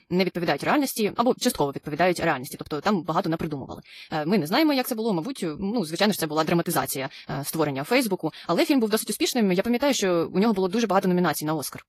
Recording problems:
wrong speed, natural pitch; too fast; 1.6 times normal speed
garbled, watery; slightly

